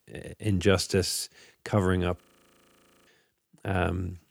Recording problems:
audio freezing; at 2 s for 1 s

